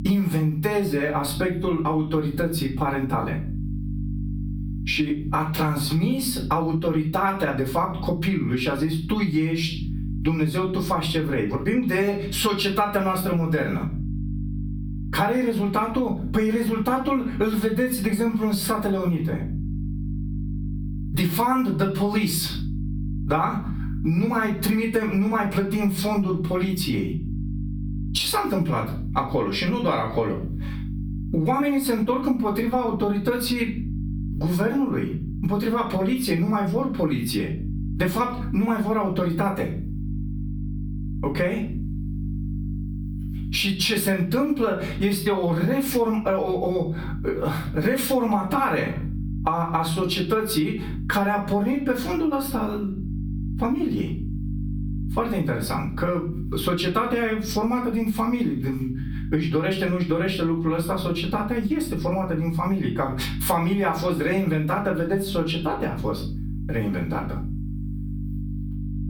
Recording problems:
off-mic speech; far
room echo; slight; dies away in 0.4 s
squashed, flat; somewhat
electrical hum; noticeable; throughout; 50 Hz, 20 dB below the speech

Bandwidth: 19 kHz